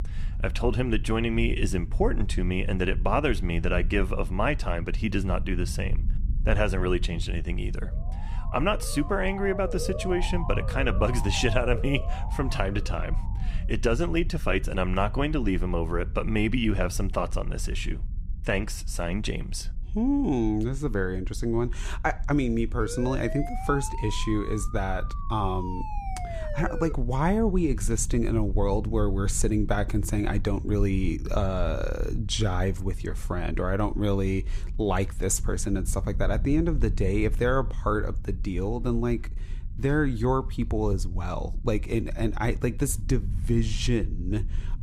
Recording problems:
low rumble; faint; throughout; 20 dB below the speech
siren; noticeable; from 8 to 13 s and from 23 to 27 s; peak 7 dB below the speech

